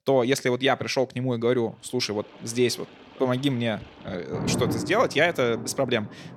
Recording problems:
rain or running water; loud; from 2 s on; 10 dB below the speech

